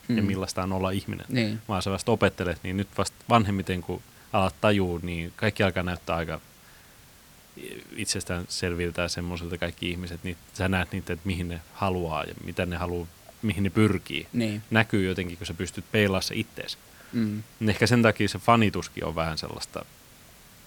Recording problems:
hiss; faint; throughout; 25 dB below the speech

